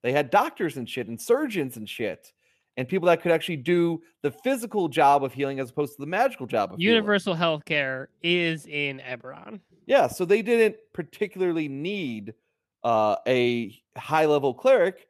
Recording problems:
none

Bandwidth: 14 kHz